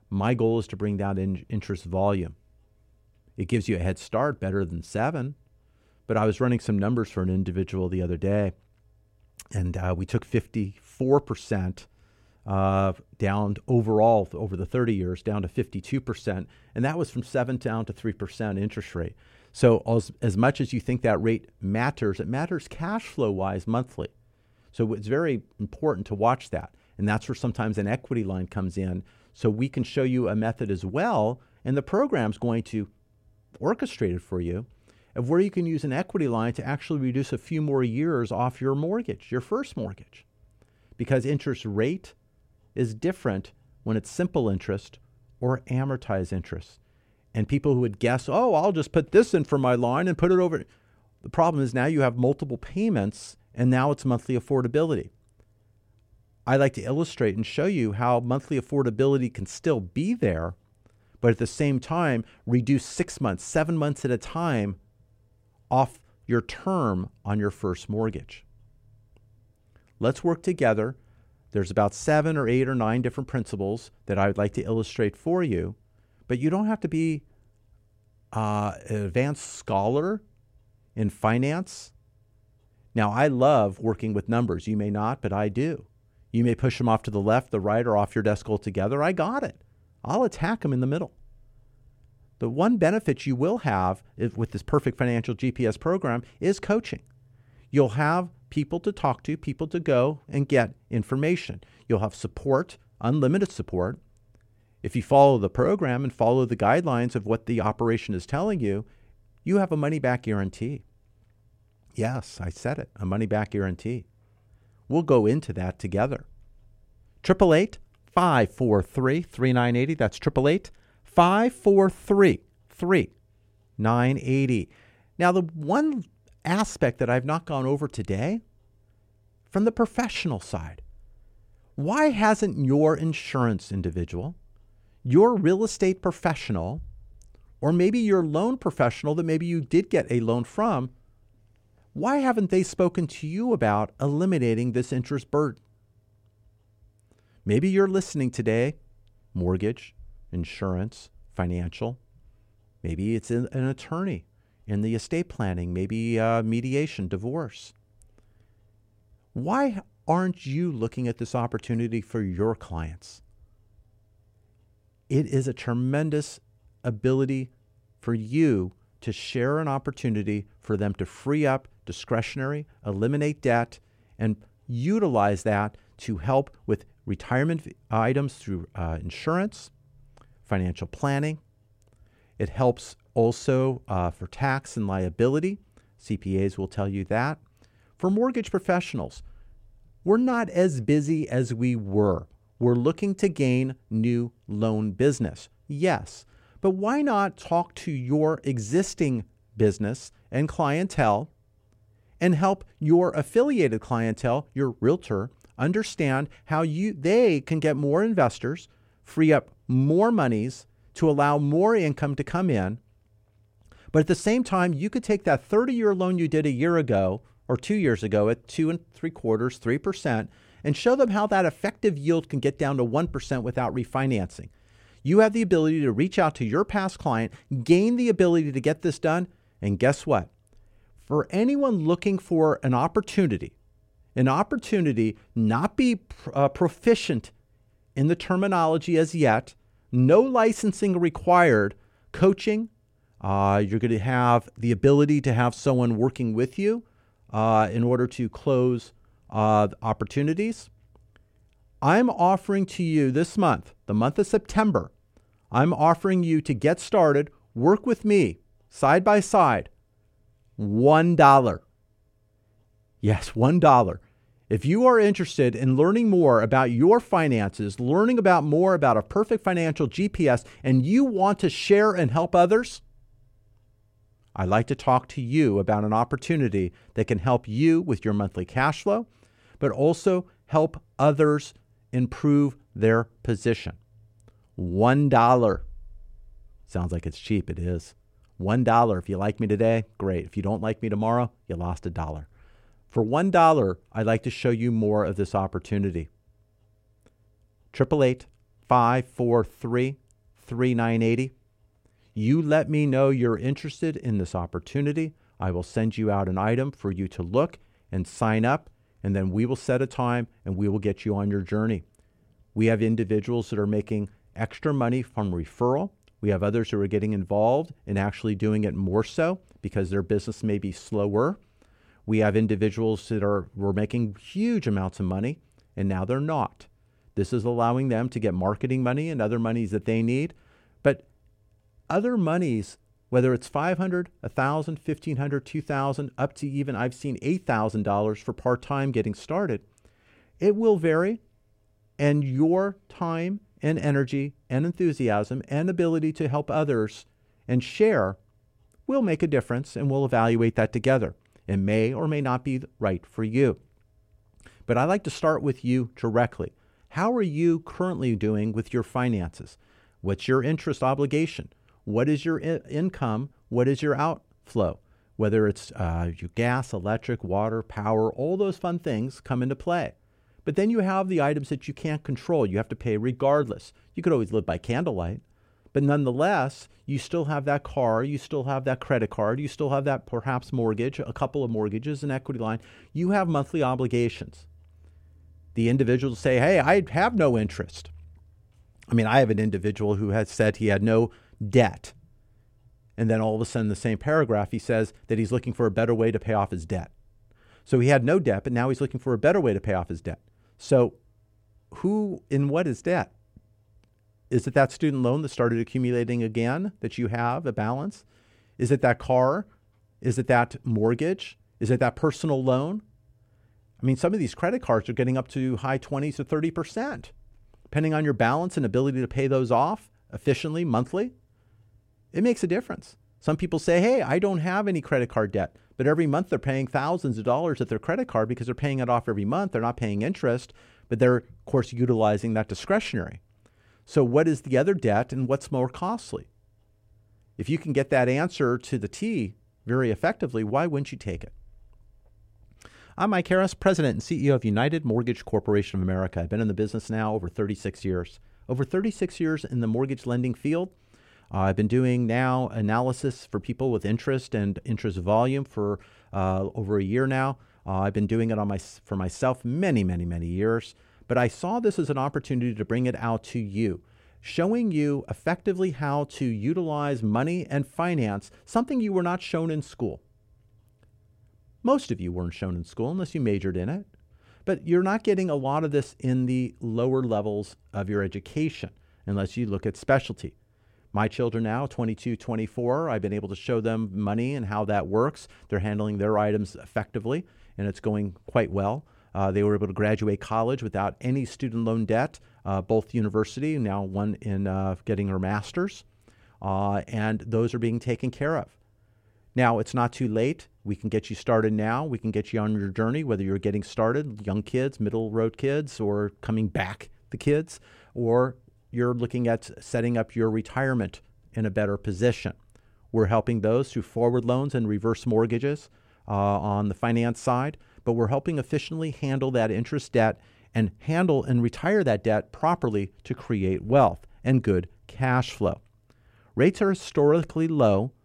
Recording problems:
none

